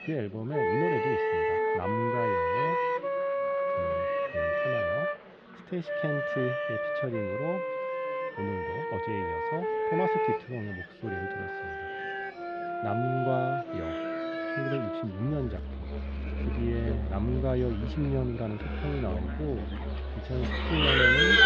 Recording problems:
muffled; slightly; fading above 3.5 kHz
animal sounds; very loud; throughout; 2 dB above the speech
background music; very loud; throughout; 3 dB above the speech
chatter from many people; noticeable; throughout; 15 dB below the speech

